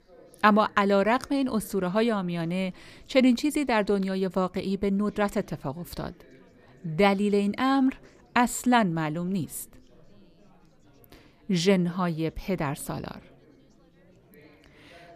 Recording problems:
chatter from many people; faint; throughout; 30 dB below the speech

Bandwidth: 14.5 kHz